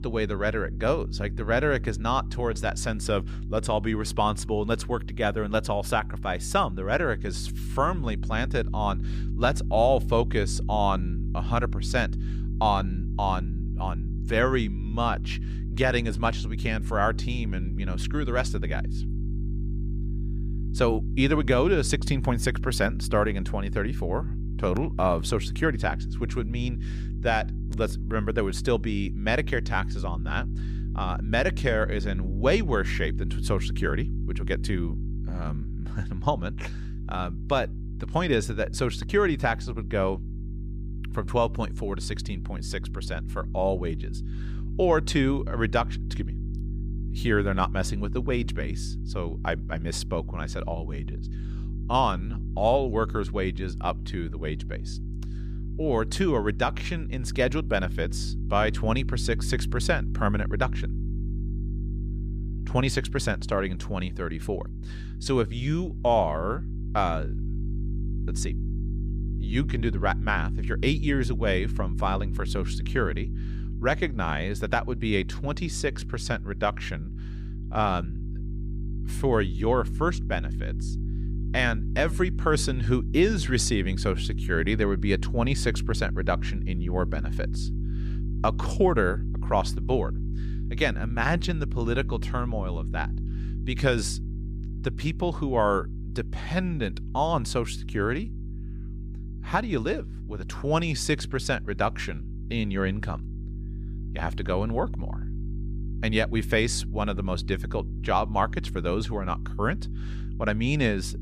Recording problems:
electrical hum; noticeable; throughout; 50 Hz, 15 dB below the speech

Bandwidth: 15 kHz